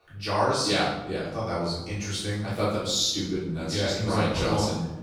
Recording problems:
off-mic speech; far
room echo; noticeable; dies away in 0.8 s

